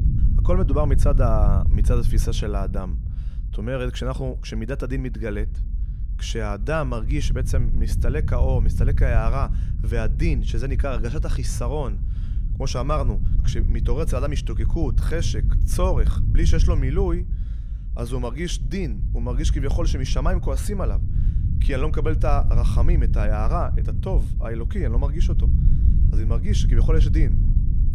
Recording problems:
low rumble; noticeable; throughout; 10 dB below the speech

